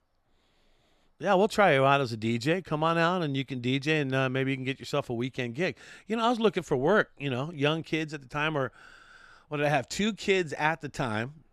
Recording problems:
none

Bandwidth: 13.5 kHz